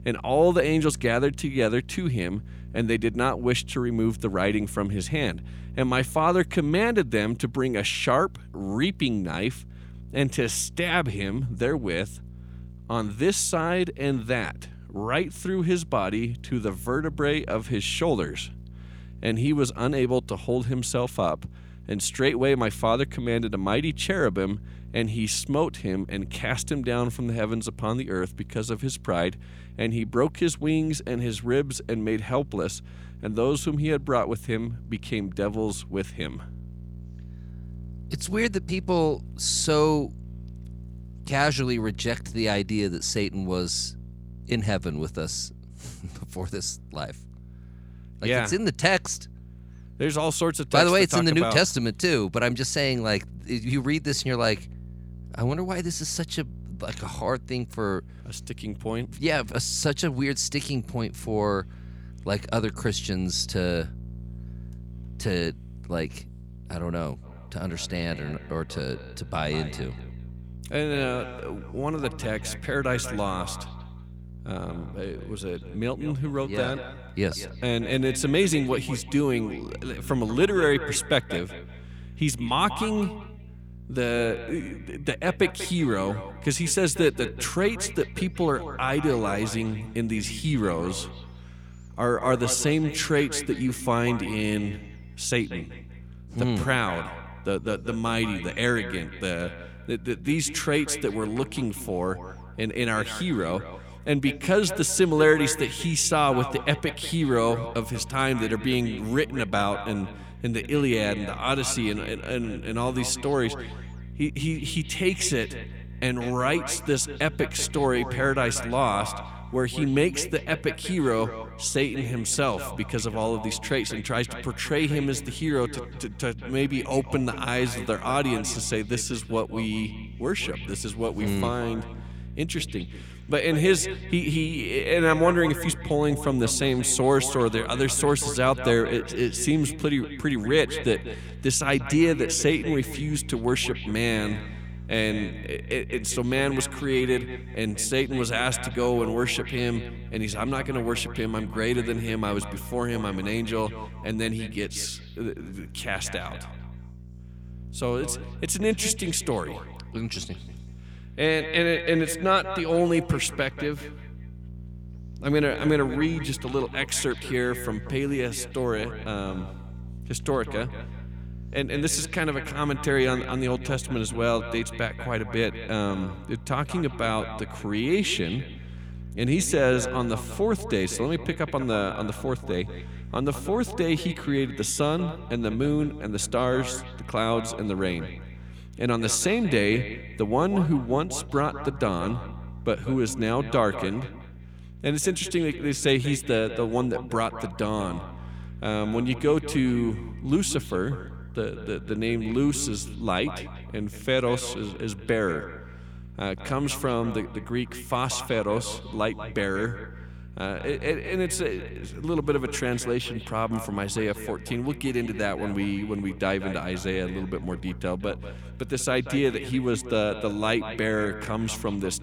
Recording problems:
echo of what is said; noticeable; from 1:07 on; 190 ms later, 15 dB below the speech
electrical hum; faint; throughout; 60 Hz, 25 dB below the speech

